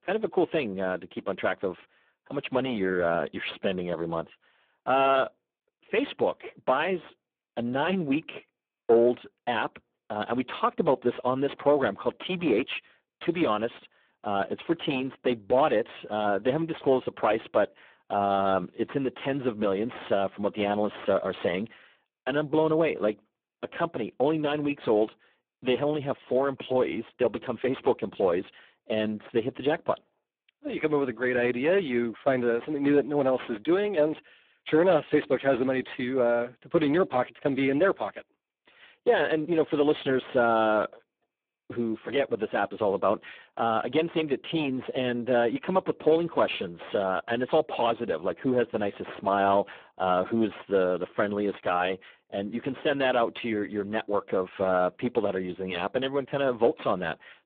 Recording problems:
phone-call audio; poor line
distortion; slight; 15 dB below the speech

